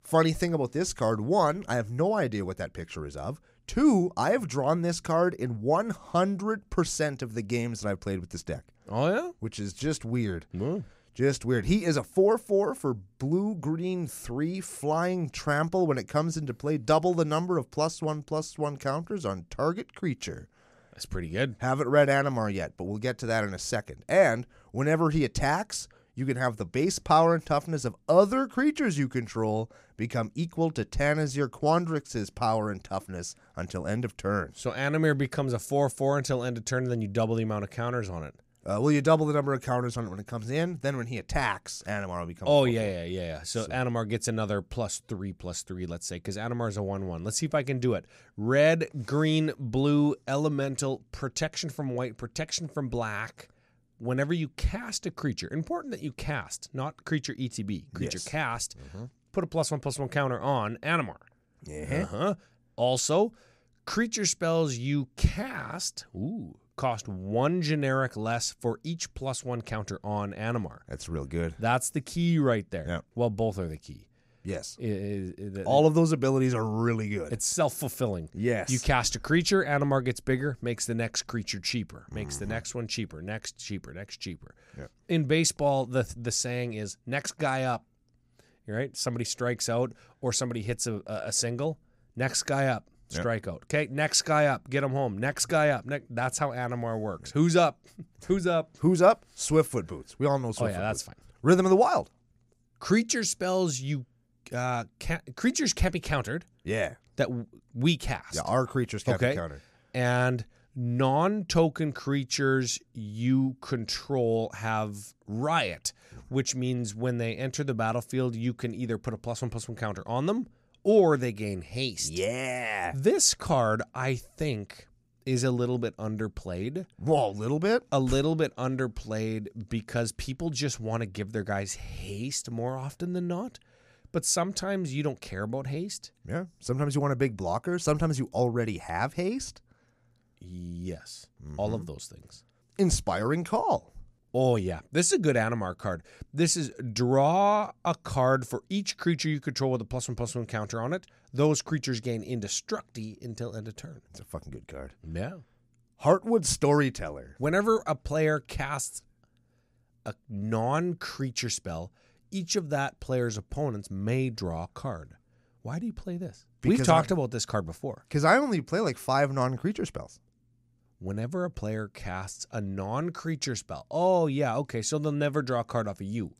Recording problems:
none

